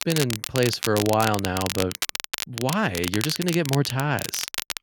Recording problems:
crackle, like an old record; loud; 5 dB below the speech

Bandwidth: 17 kHz